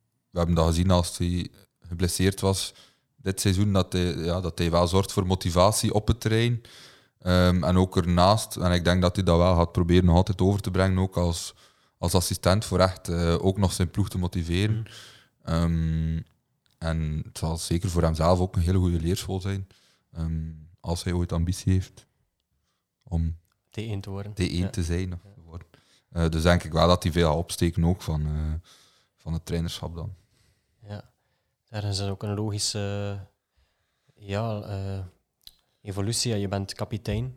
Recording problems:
none

